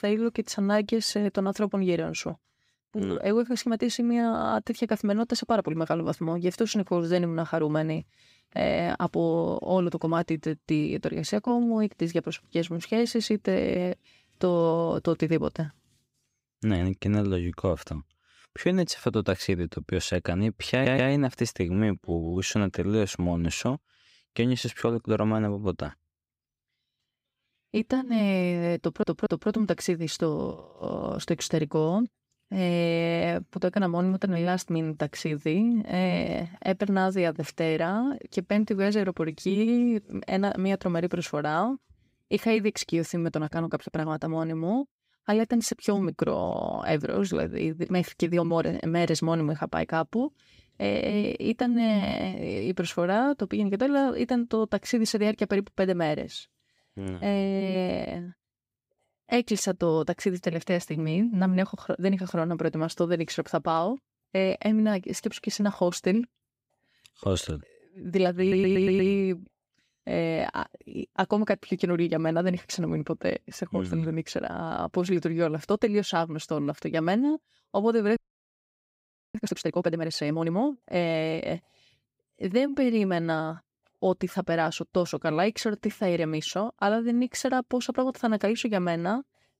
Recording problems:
audio stuttering; at 21 s, at 29 s and at 1:08
audio freezing; at 1:18 for 1 s

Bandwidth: 15.5 kHz